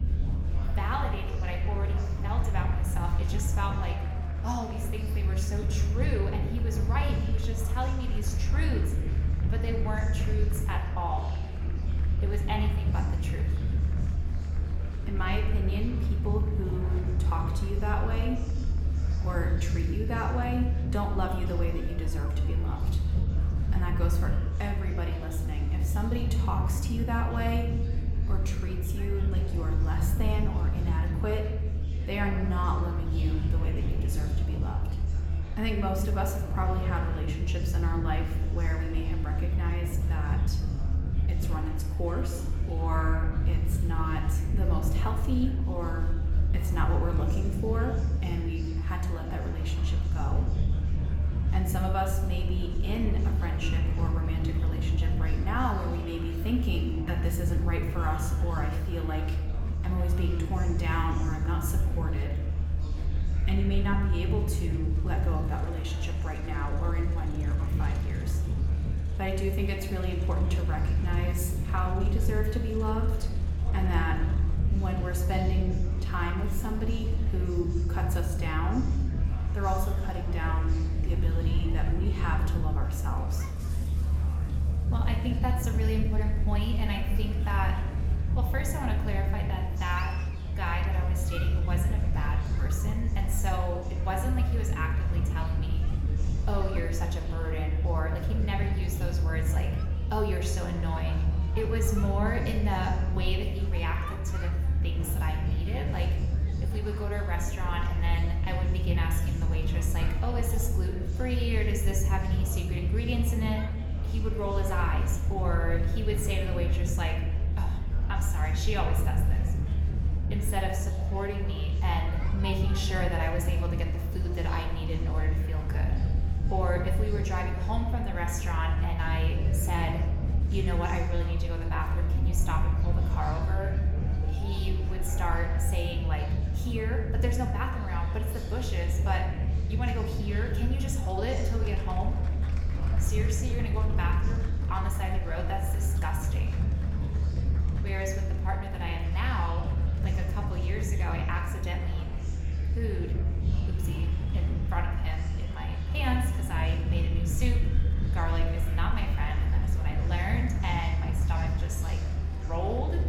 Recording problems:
room echo; slight; dies away in 0.9 s
off-mic speech; somewhat distant
low rumble; loud; throughout; 10 dB below the speech
murmuring crowd; noticeable; throughout; 10 dB below the speech

